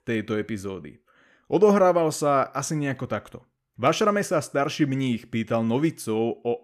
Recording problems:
none

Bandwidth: 14.5 kHz